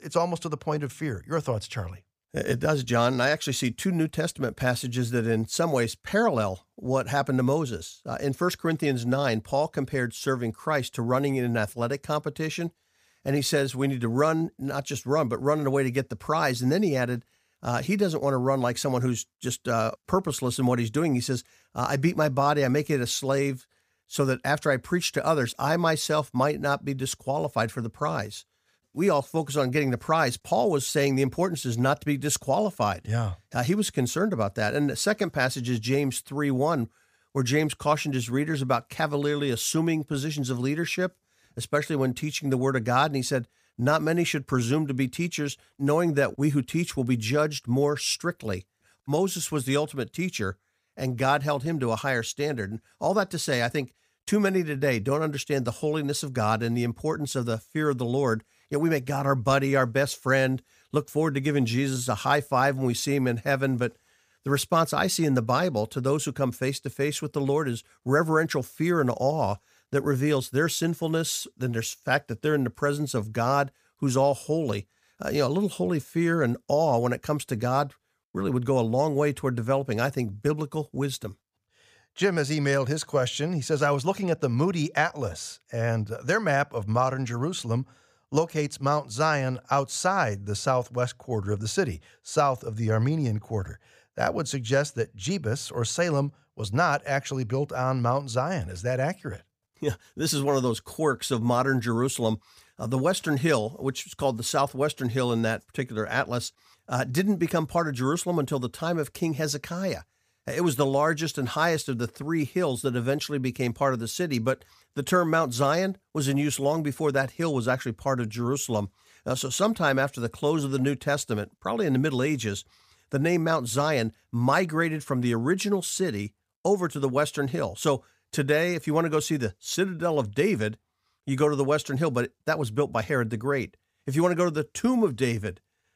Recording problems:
none

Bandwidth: 15 kHz